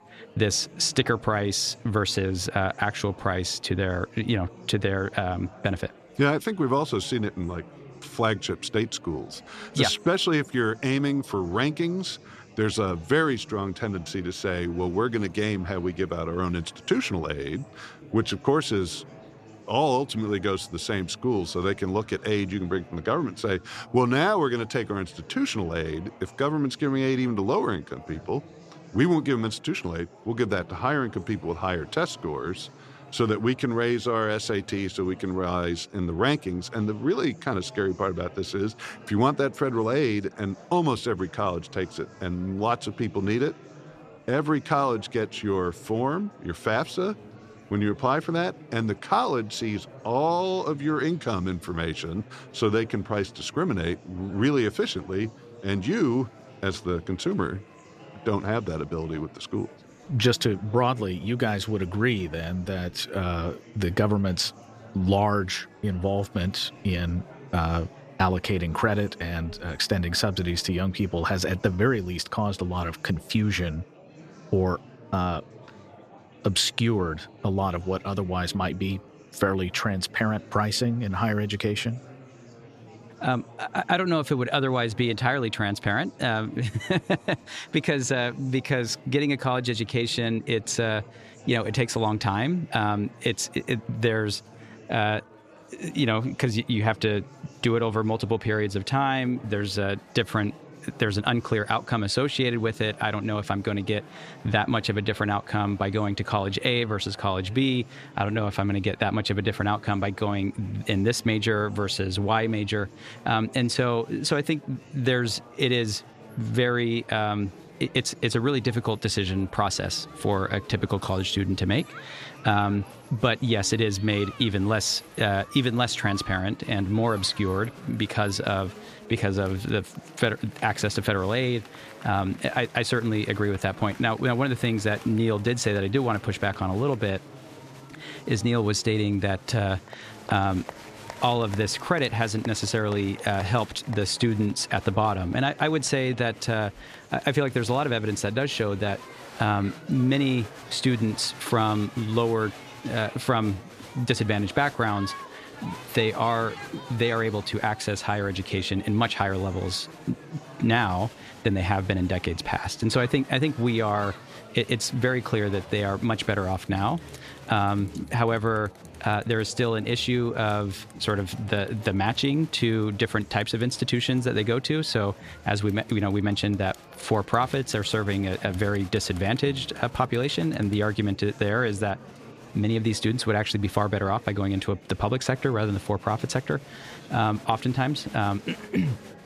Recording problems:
murmuring crowd; noticeable; throughout; 20 dB below the speech

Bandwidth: 14.5 kHz